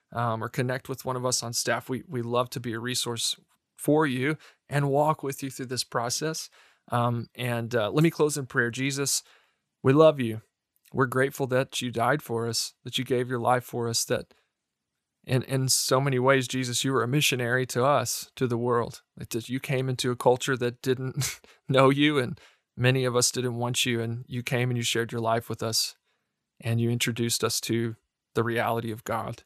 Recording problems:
none

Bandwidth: 14.5 kHz